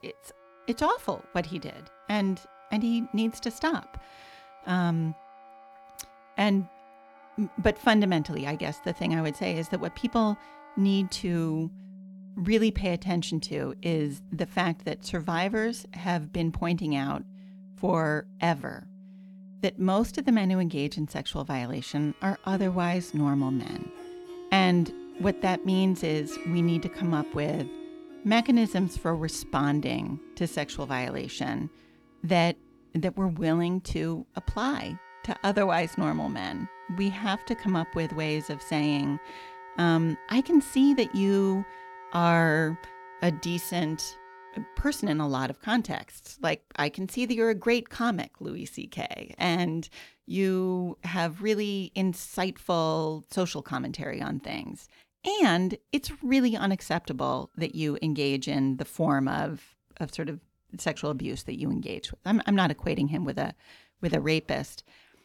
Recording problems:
background music; noticeable; throughout; 15 dB below the speech

